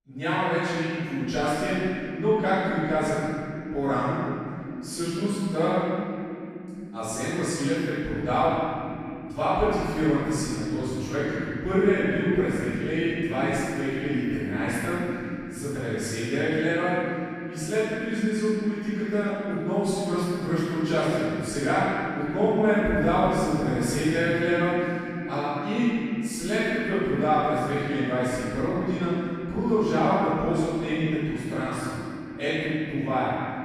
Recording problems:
room echo; strong; dies away in 3 s
off-mic speech; far

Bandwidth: 14.5 kHz